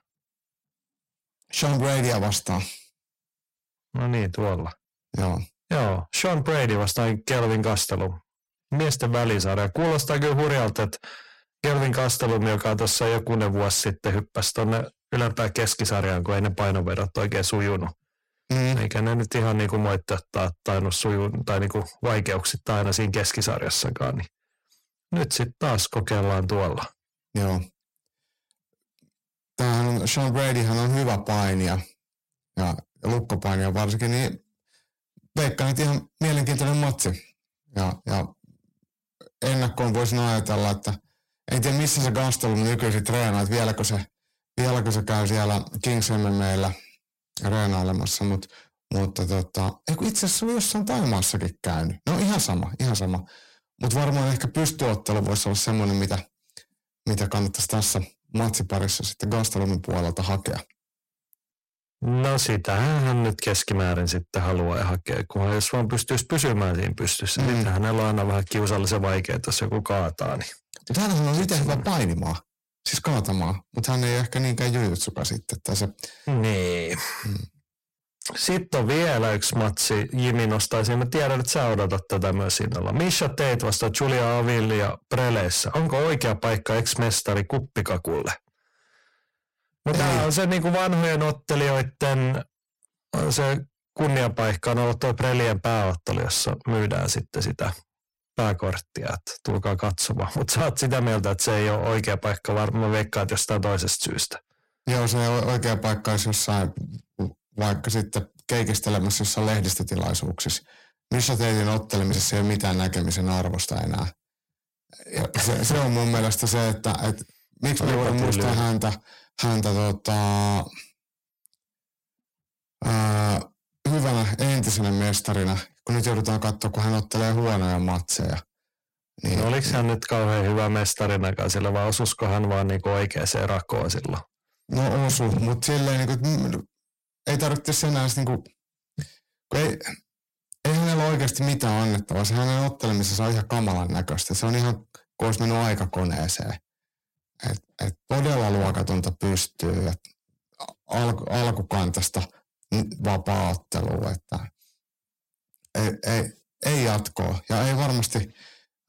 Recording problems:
distortion; heavy; 6 dB below the speech

